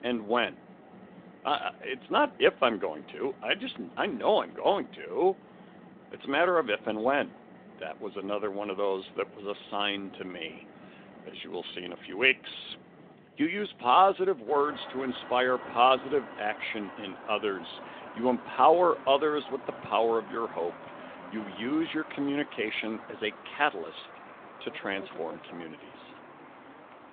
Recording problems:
phone-call audio
traffic noise; noticeable; throughout; 20 dB below the speech

